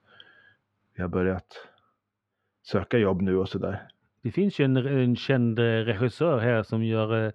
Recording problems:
muffled; slightly; fading above 2.5 kHz

